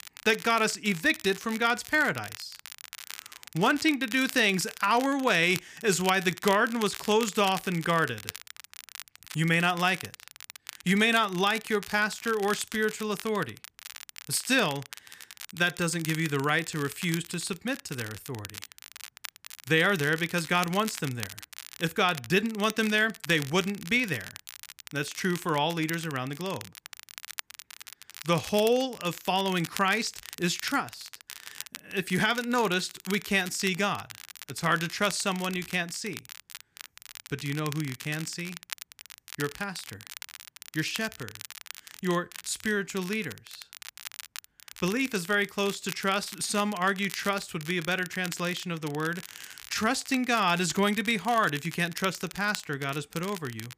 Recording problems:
crackle, like an old record; noticeable; 15 dB below the speech

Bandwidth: 15 kHz